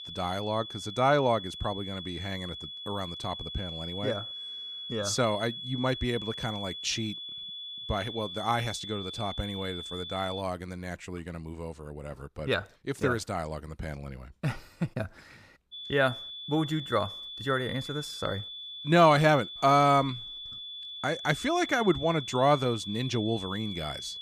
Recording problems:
high-pitched whine; loud; until 10 s and from 16 s on; 3.5 kHz, 8 dB below the speech

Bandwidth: 15 kHz